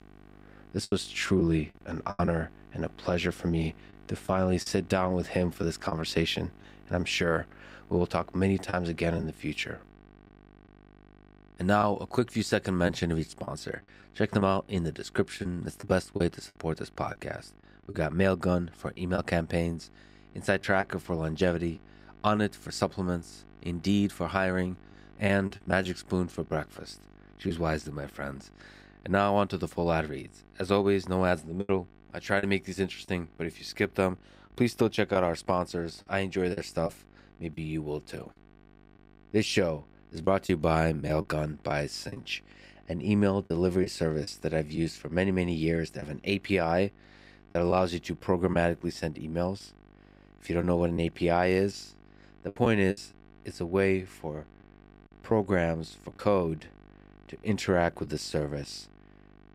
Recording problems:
electrical hum; faint; throughout; 50 Hz, 30 dB below the speech
choppy; occasionally; 4% of the speech affected

